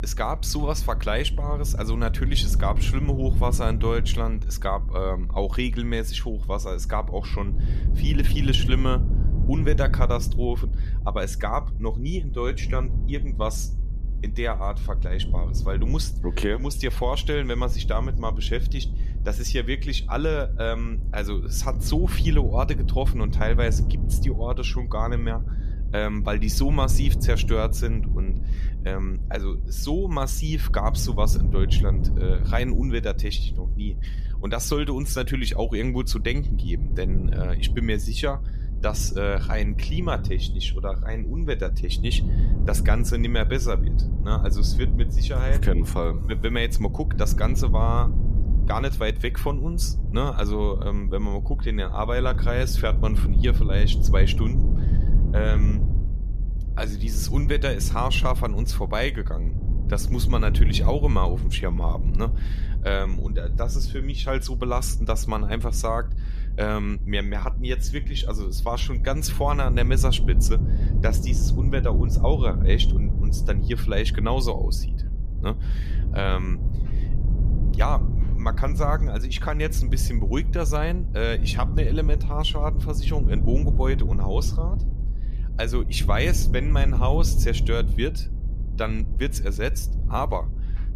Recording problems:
low rumble; noticeable; throughout; 10 dB below the speech

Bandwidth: 14.5 kHz